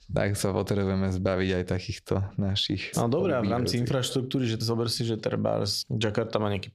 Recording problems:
squashed, flat; heavily

